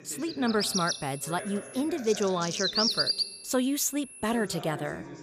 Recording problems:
animal sounds; very loud; throughout; as loud as the speech
high-pitched whine; noticeable; from 0.5 to 2 s and from 3 to 4.5 s; 10.5 kHz, 15 dB below the speech
voice in the background; noticeable; throughout; 15 dB below the speech

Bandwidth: 15 kHz